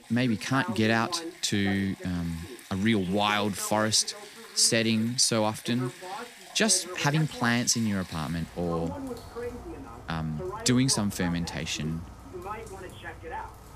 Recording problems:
rain or running water; noticeable; throughout; 20 dB below the speech
voice in the background; noticeable; throughout; 15 dB below the speech
uneven, jittery; strongly; from 1 to 7.5 s

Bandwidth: 15 kHz